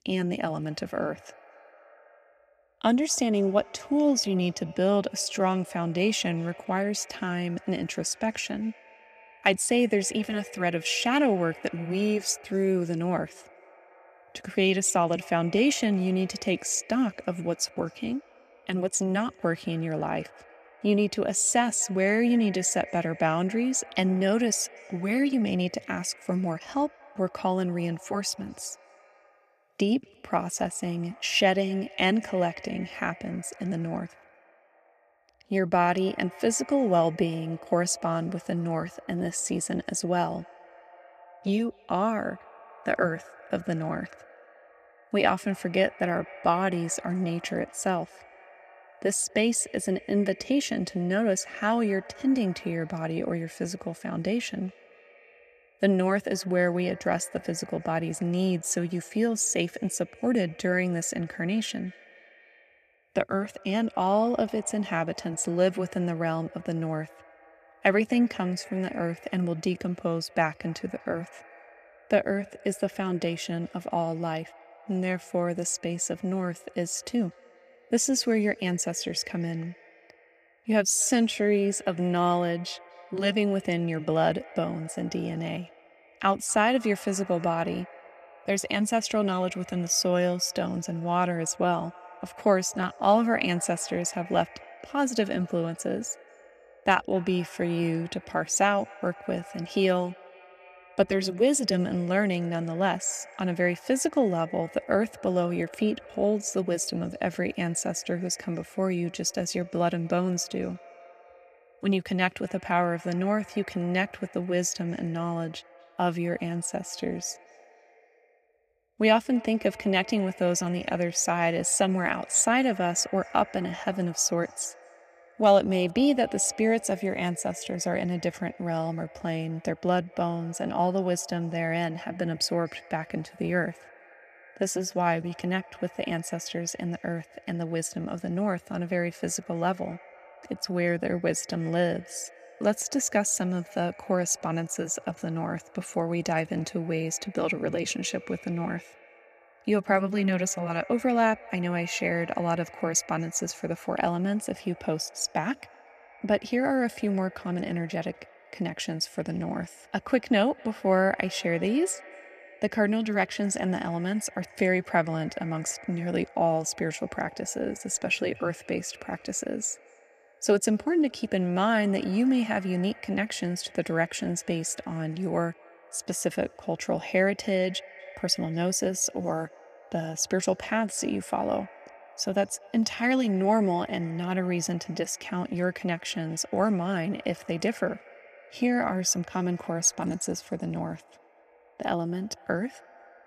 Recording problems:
echo of what is said; faint; throughout; 240 ms later, 20 dB below the speech

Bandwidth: 14.5 kHz